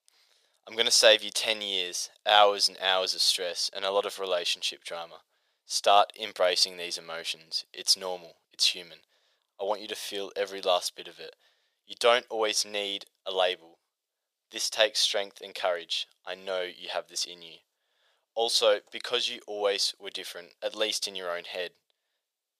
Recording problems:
thin; very; fading below 500 Hz

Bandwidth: 15 kHz